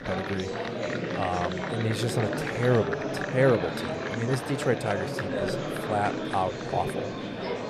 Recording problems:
murmuring crowd; loud; throughout; 2 dB below the speech

